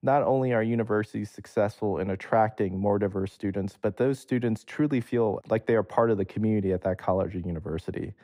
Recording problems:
muffled; slightly; fading above 1.5 kHz

